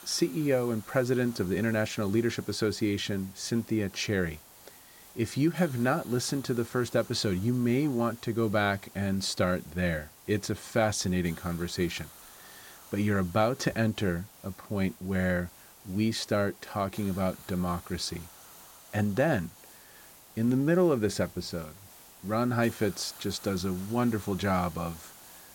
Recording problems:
hiss; noticeable; throughout; 20 dB below the speech

